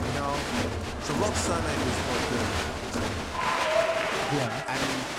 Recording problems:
crowd noise; very loud; throughout; 5 dB above the speech

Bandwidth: 16.5 kHz